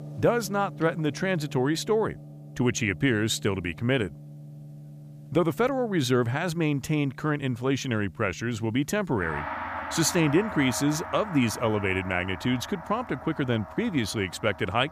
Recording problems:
background music; noticeable; throughout; 15 dB below the speech

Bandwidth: 15 kHz